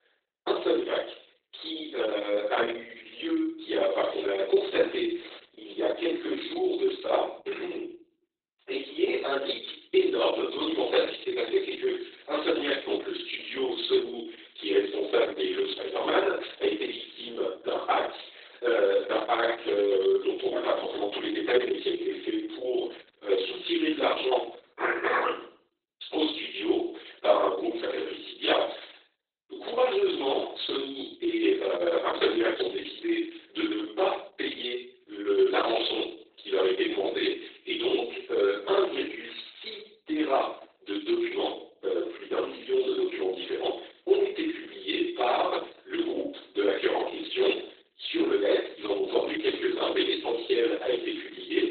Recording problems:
off-mic speech; far
garbled, watery; badly; nothing above 4 kHz
thin; very; fading below 350 Hz
room echo; noticeable; dies away in 0.5 s

